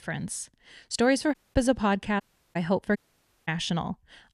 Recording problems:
audio cutting out; at 1.5 s, at 2 s and at 3 s for 0.5 s

